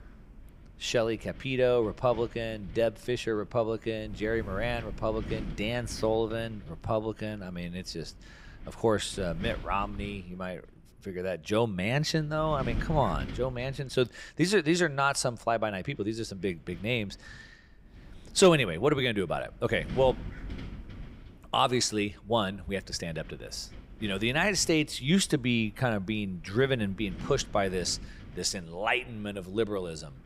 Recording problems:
wind noise on the microphone; occasional gusts; 20 dB below the speech

